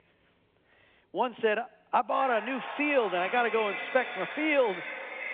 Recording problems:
echo of what is said; strong; from 2 s on; 340 ms later, 8 dB below the speech
phone-call audio
traffic noise; faint; throughout; 20 dB below the speech

